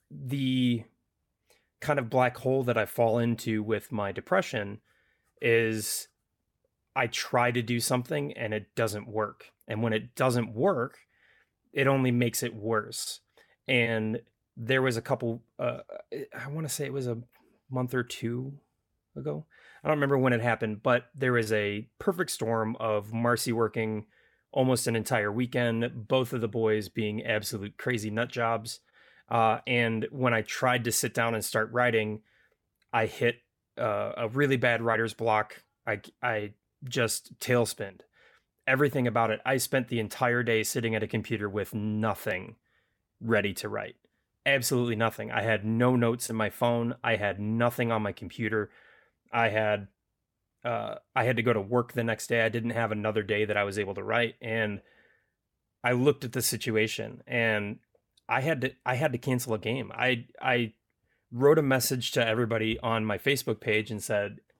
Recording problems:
none

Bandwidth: 18 kHz